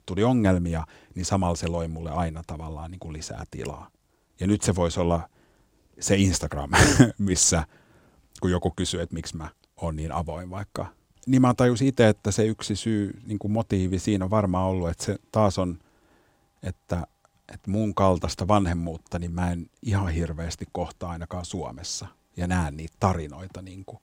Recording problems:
none

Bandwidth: 16 kHz